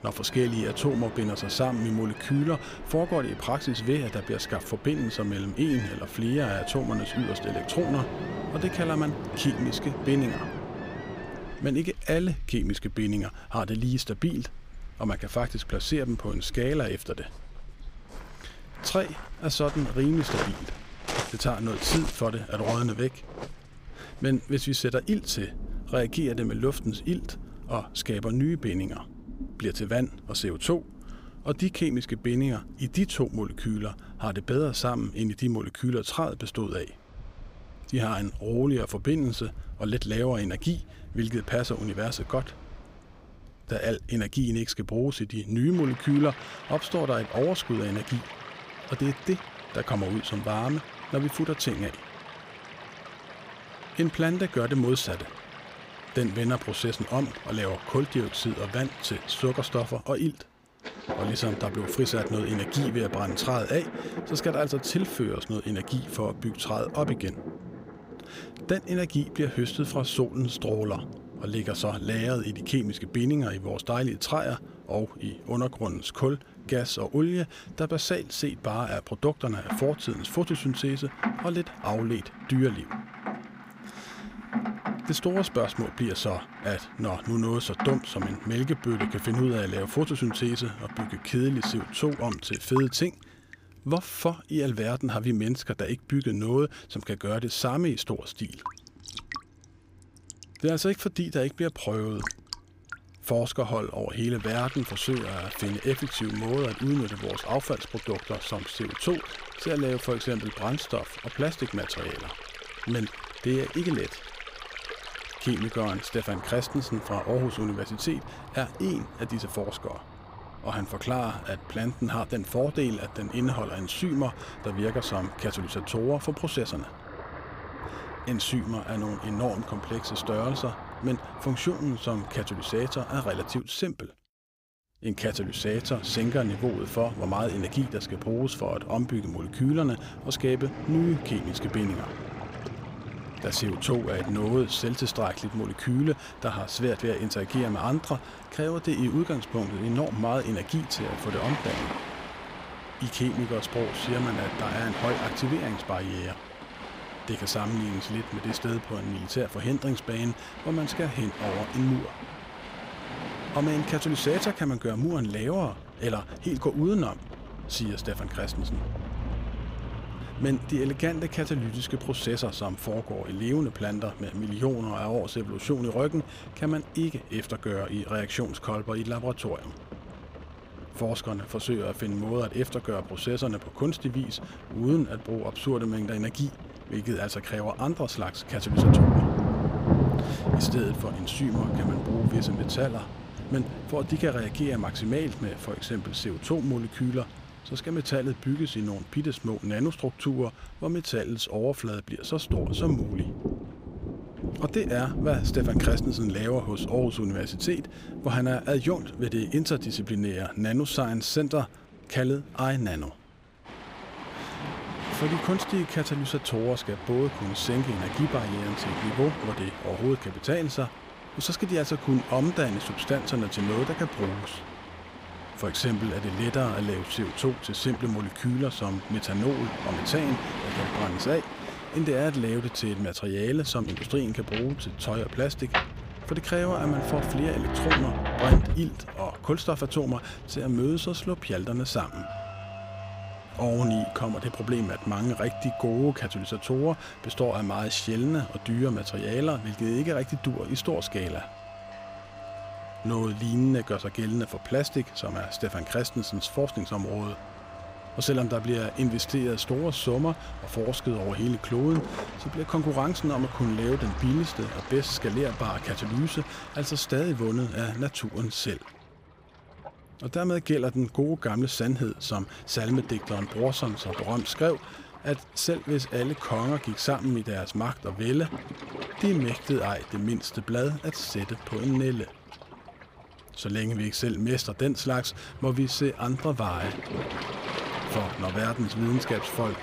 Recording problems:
rain or running water; loud; throughout; 8 dB below the speech
dog barking; noticeable; from 6.5 to 8.5 s; peak 9 dB below the speech

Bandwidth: 15.5 kHz